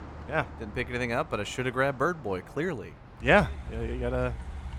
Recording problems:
traffic noise; noticeable; throughout; 15 dB below the speech

